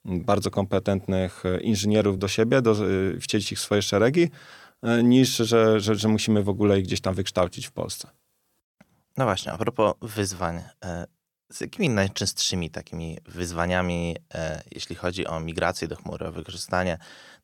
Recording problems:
uneven, jittery; strongly; from 2 to 17 s

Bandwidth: 17.5 kHz